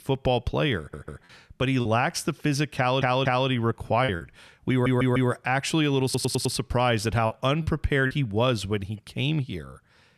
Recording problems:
audio stuttering; 4 times, first at 1 s
choppy; occasionally; at 2 s, at 4 s and at 7.5 s; 4% of the speech affected

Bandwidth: 14 kHz